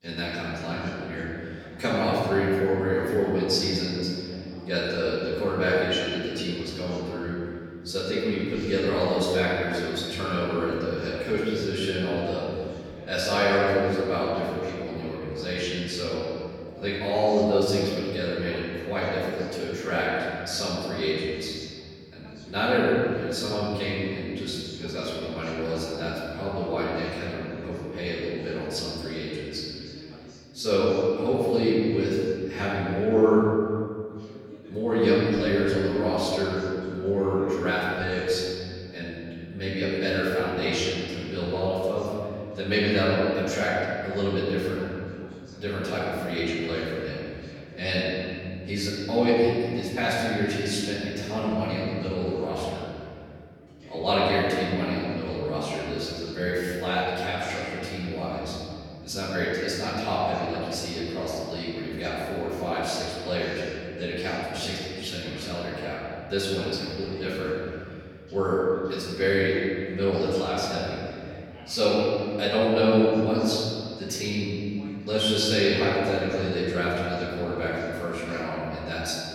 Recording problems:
room echo; strong; dies away in 2.3 s
off-mic speech; far
voice in the background; faint; throughout; 20 dB below the speech

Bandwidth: 17.5 kHz